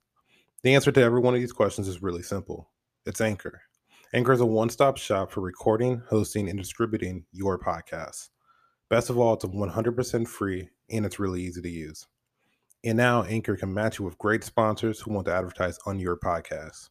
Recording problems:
none

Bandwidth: 14.5 kHz